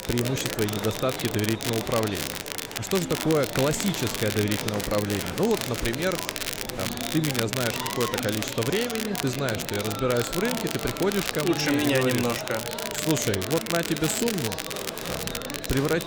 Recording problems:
murmuring crowd; loud; throughout; 7 dB below the speech
crackle, like an old record; loud; 4 dB below the speech
electrical hum; faint; throughout; 50 Hz, 25 dB below the speech
background music; faint; throughout; 20 dB below the speech

